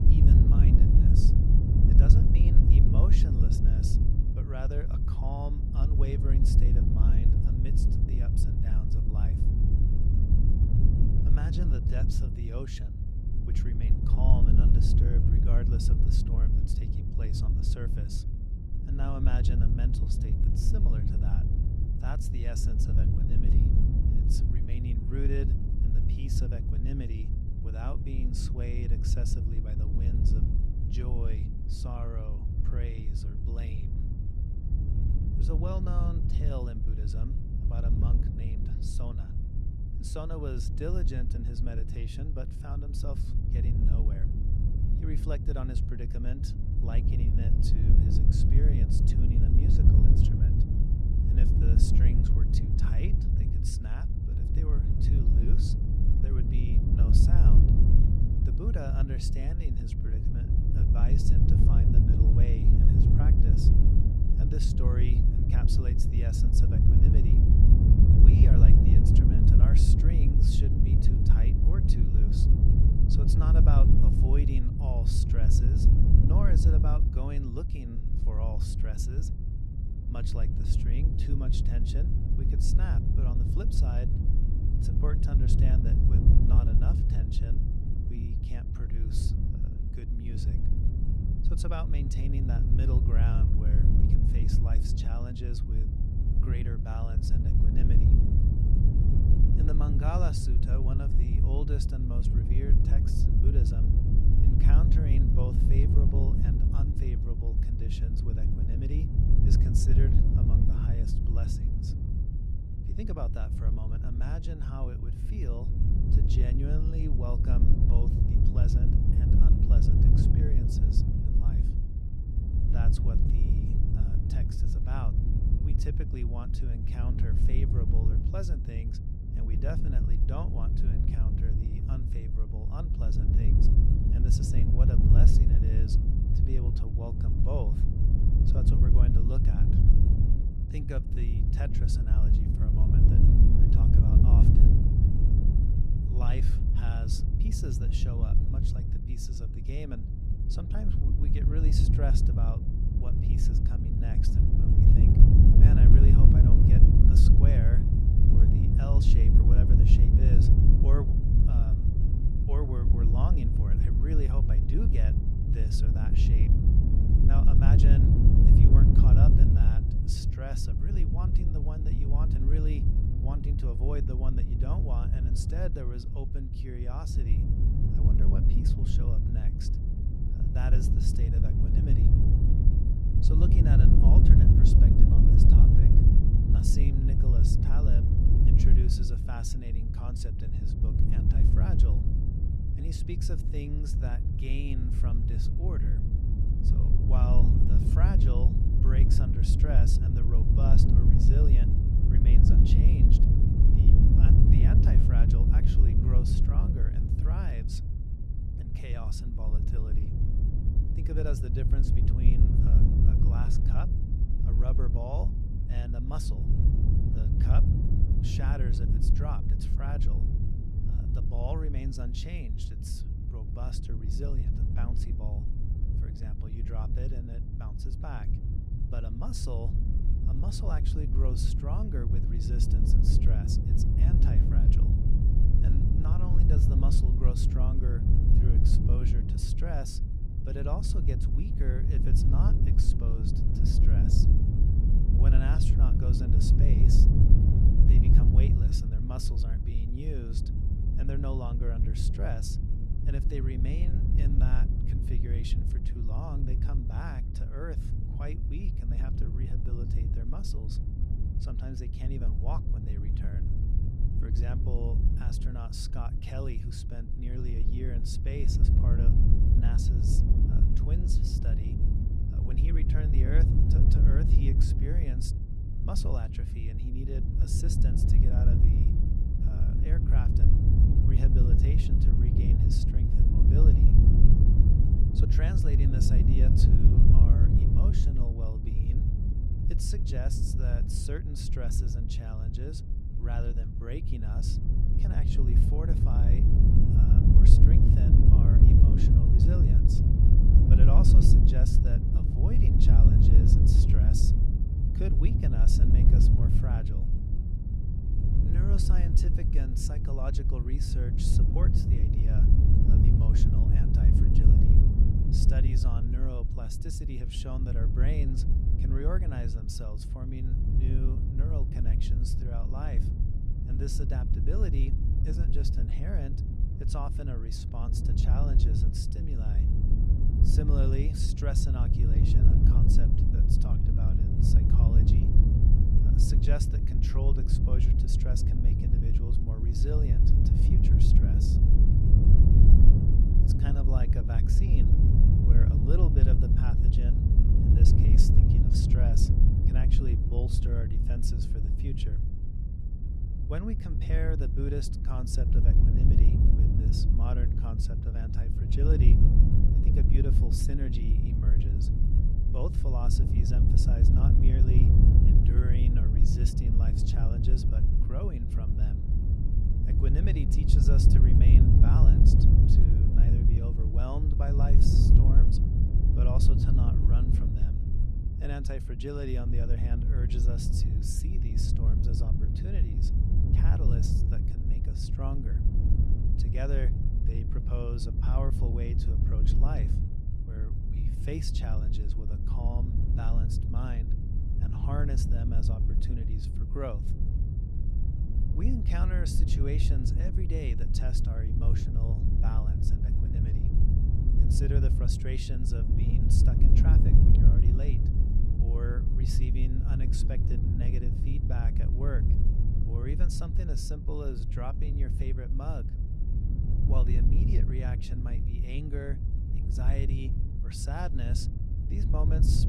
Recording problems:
wind noise on the microphone; heavy; 3 dB above the speech

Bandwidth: 15.5 kHz